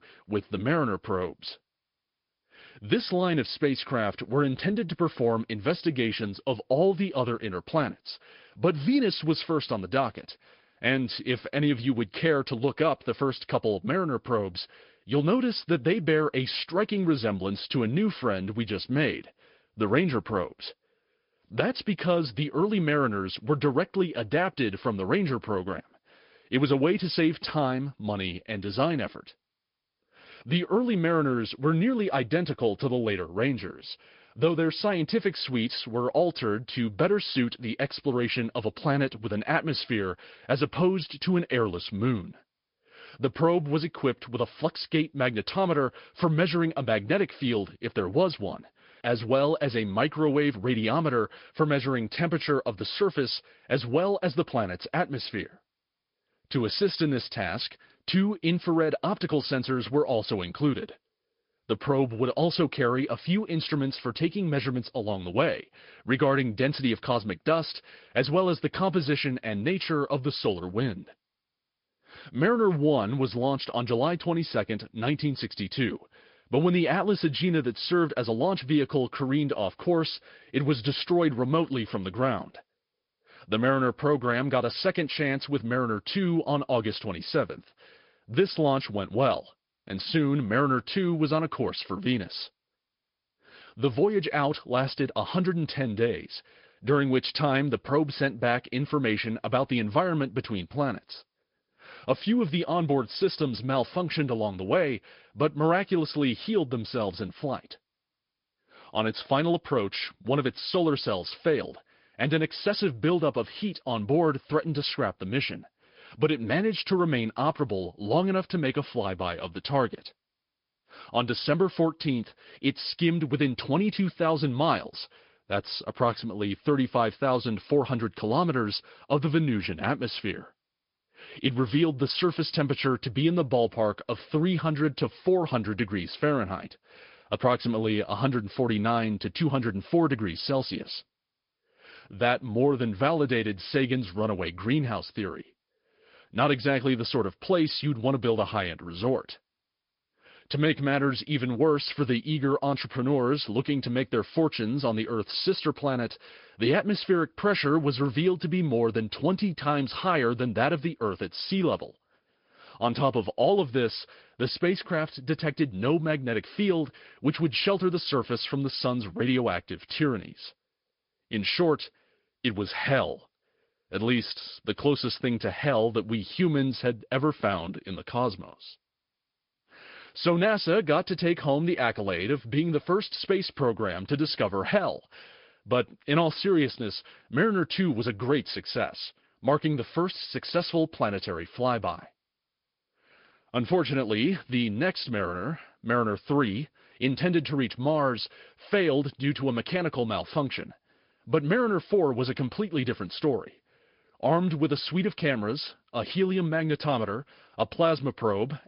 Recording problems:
high frequencies cut off; noticeable; nothing above 5 kHz
garbled, watery; slightly

